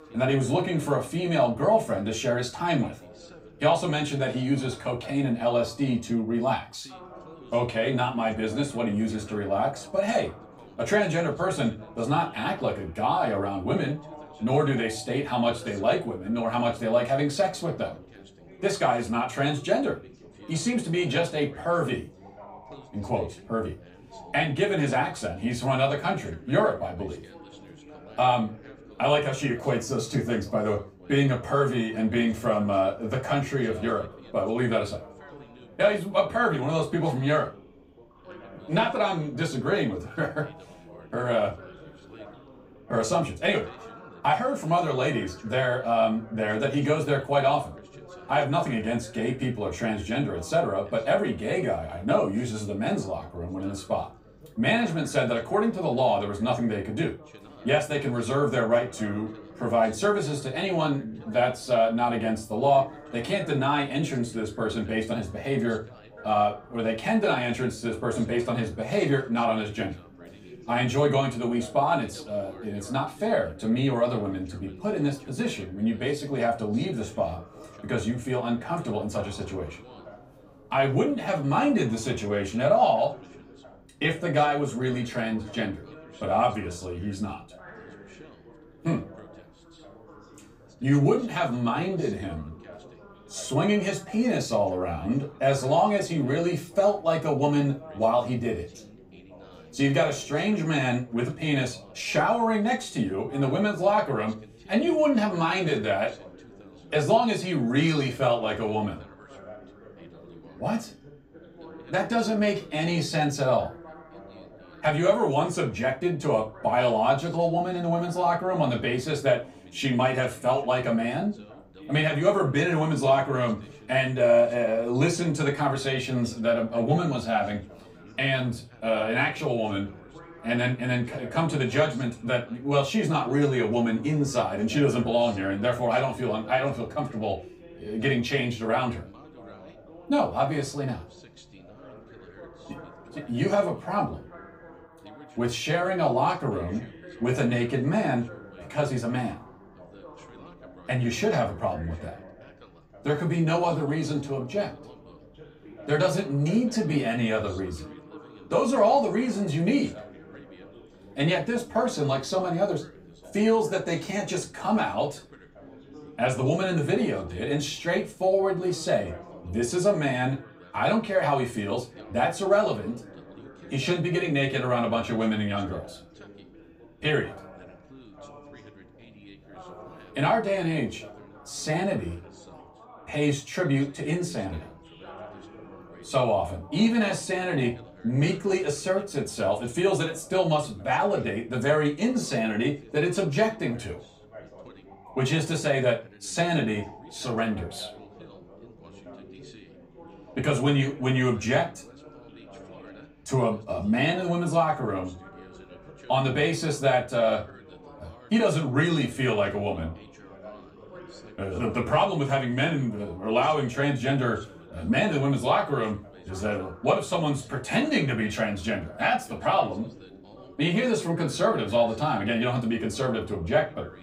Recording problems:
off-mic speech; far
room echo; very slight; dies away in 0.2 s
background chatter; faint; throughout; 3 voices, 20 dB below the speech

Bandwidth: 15.5 kHz